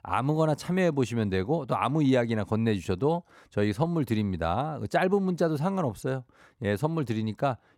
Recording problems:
none

